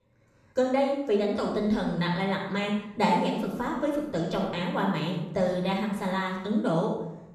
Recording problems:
off-mic speech; far
room echo; noticeable; dies away in 0.7 s

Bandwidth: 13.5 kHz